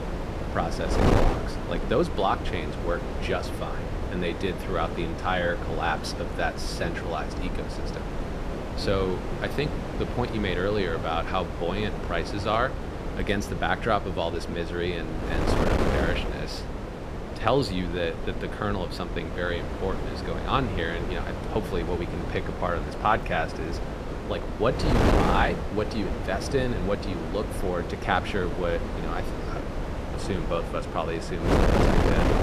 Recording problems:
wind noise on the microphone; heavy; 4 dB below the speech

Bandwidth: 14.5 kHz